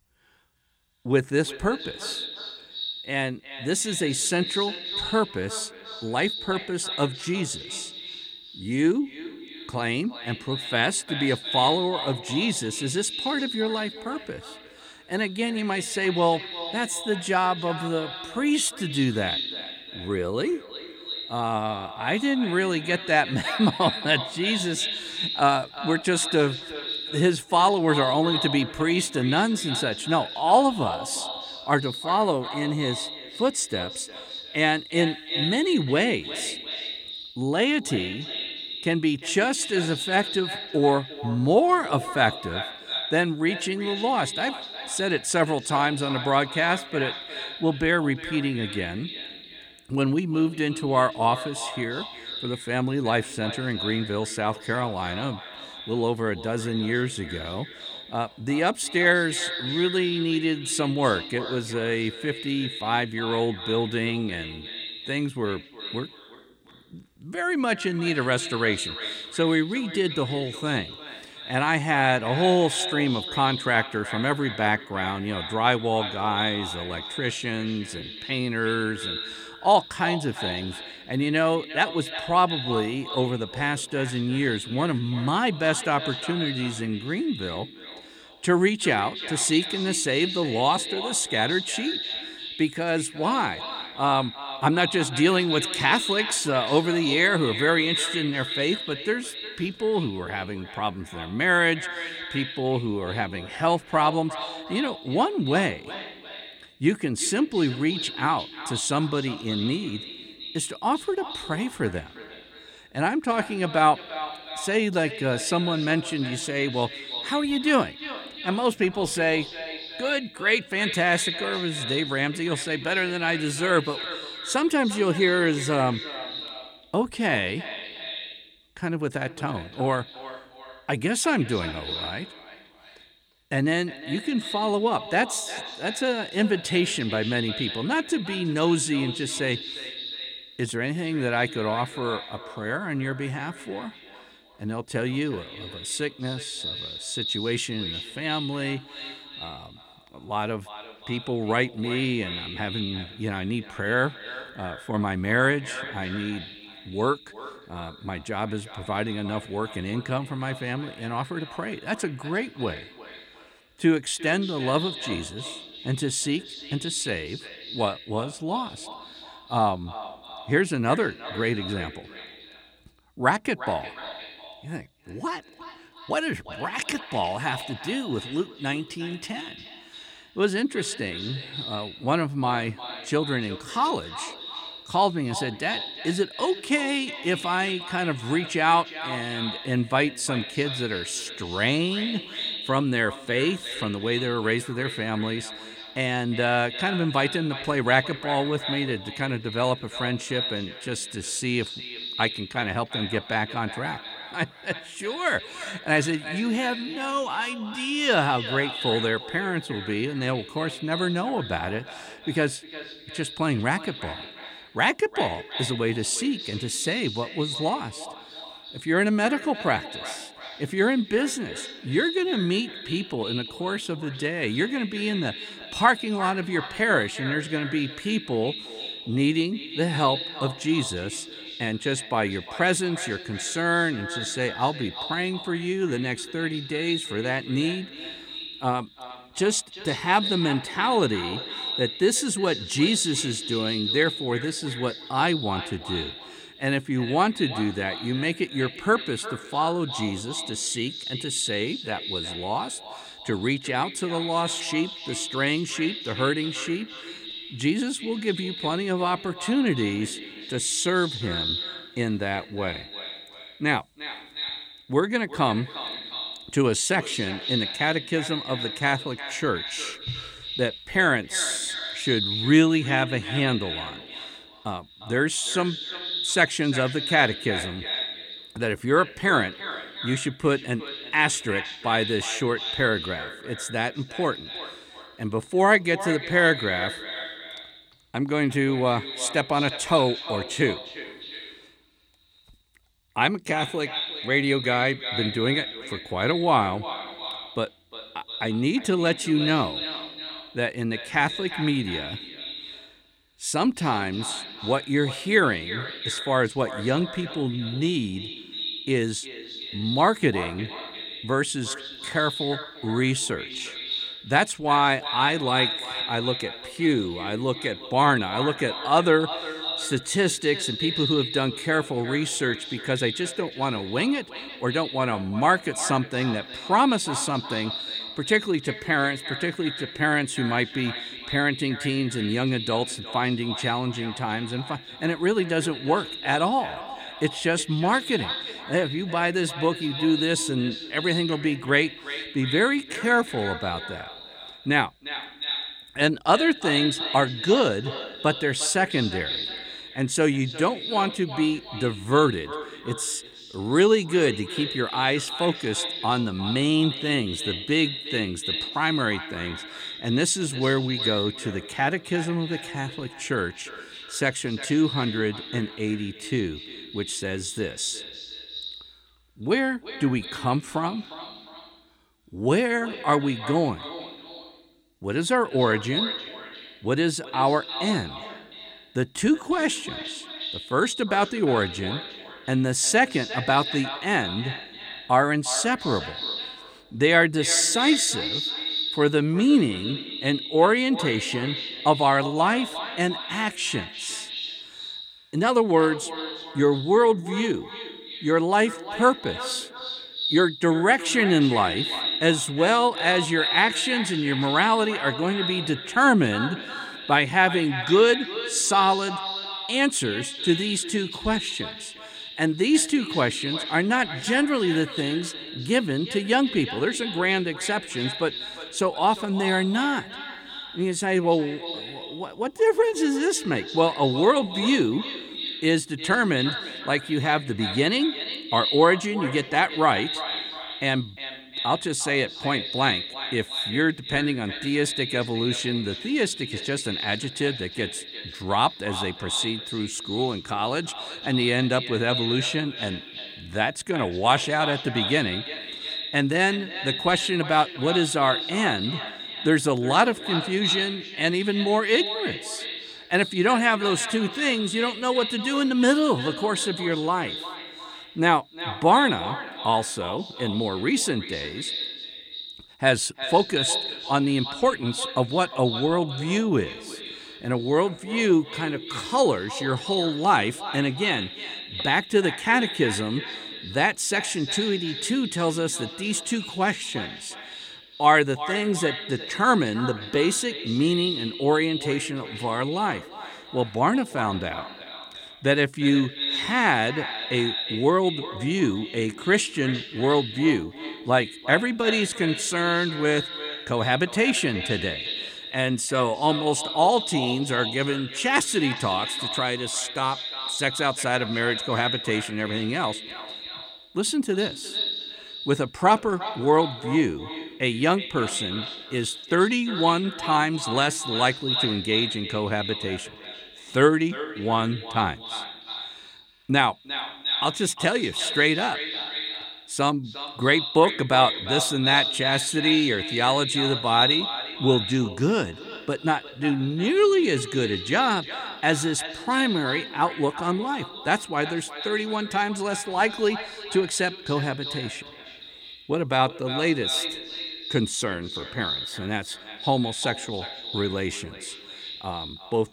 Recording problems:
echo of what is said; strong; throughout; 350 ms later, 8 dB below the speech

